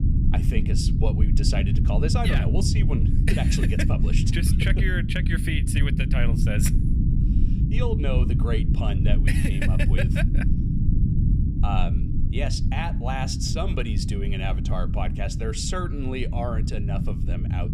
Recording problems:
low rumble; loud; throughout; 5 dB below the speech

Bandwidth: 15.5 kHz